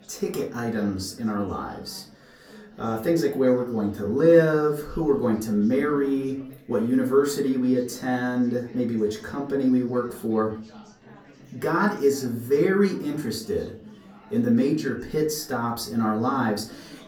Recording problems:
off-mic speech; far
room echo; very slight; dies away in 0.3 s
chatter from many people; faint; throughout; 25 dB below the speech

